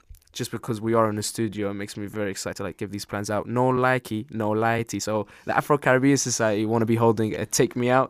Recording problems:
uneven, jittery; strongly; from 0.5 to 7.5 s

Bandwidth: 15 kHz